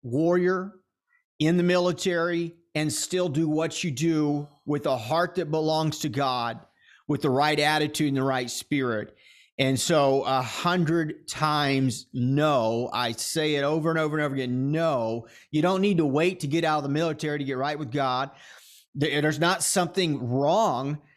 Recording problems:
none

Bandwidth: 14 kHz